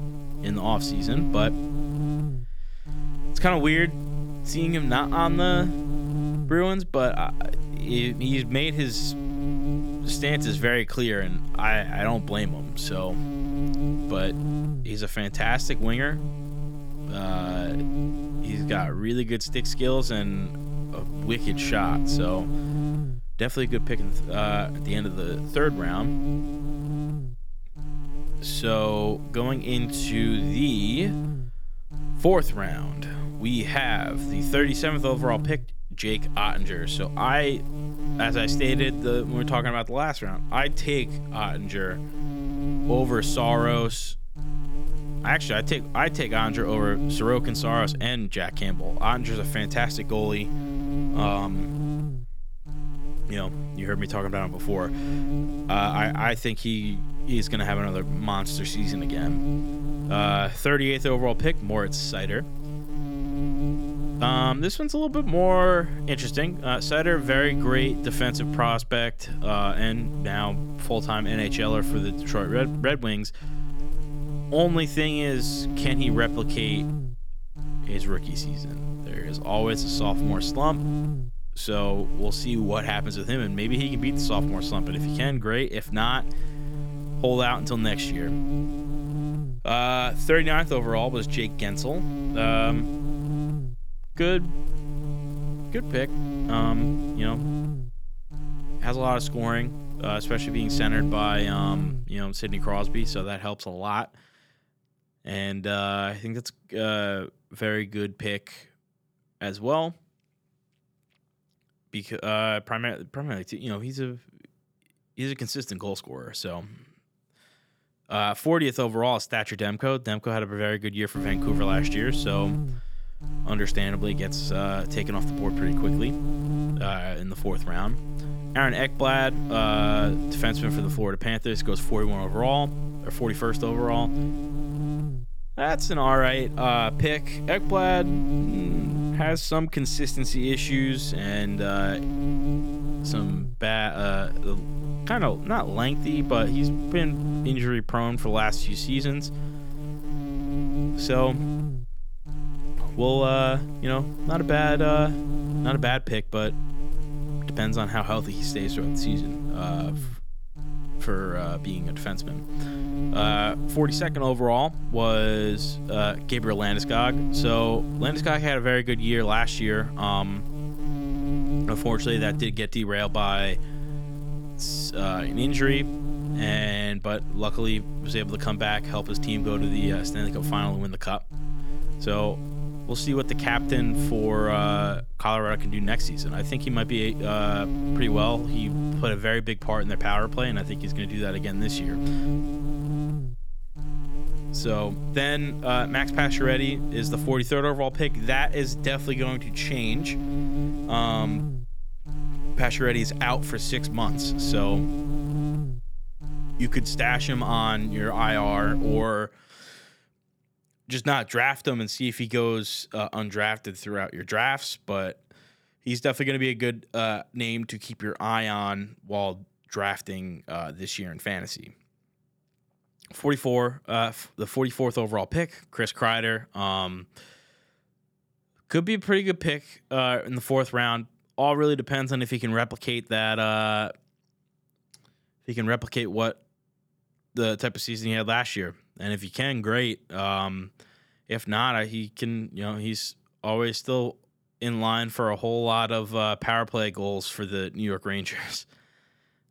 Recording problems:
electrical hum; noticeable; until 1:43 and from 2:01 to 3:29; 50 Hz, 10 dB below the speech

